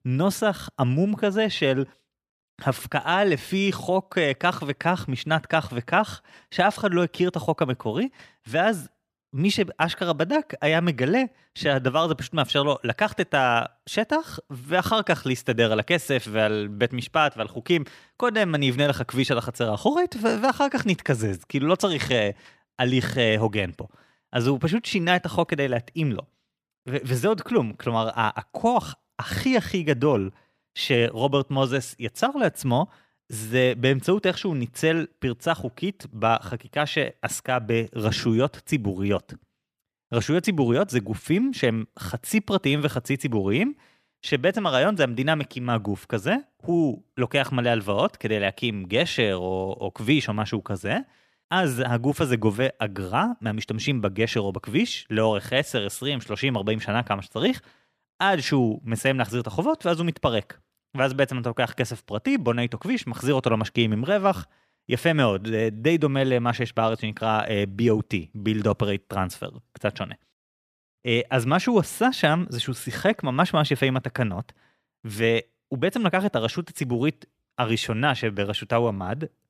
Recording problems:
none

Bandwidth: 15 kHz